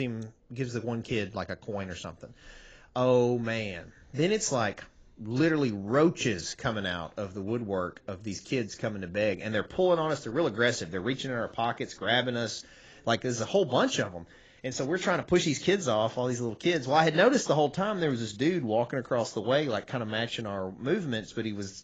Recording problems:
garbled, watery; badly; nothing above 7.5 kHz
abrupt cut into speech; at the start

